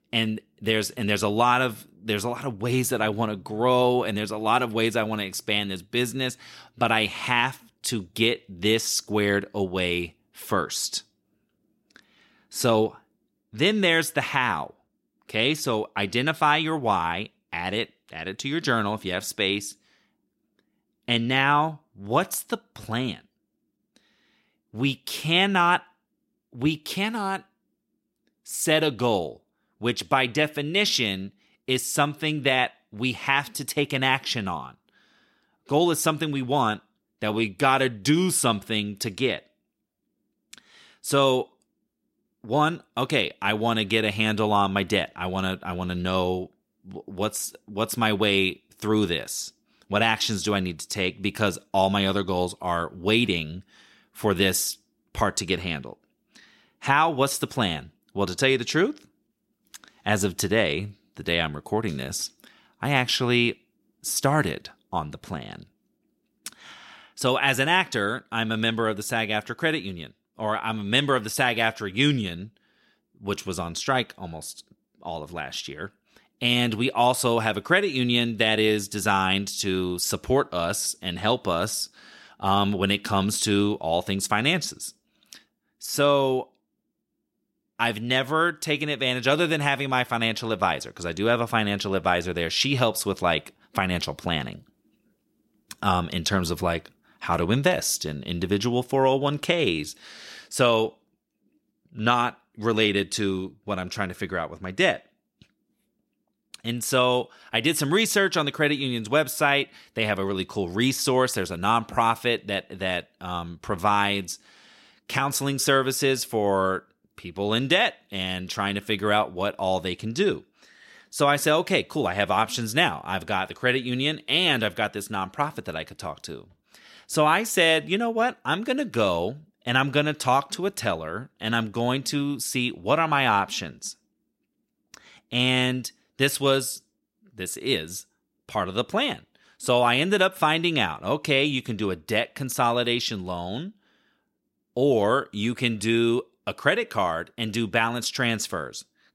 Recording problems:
none

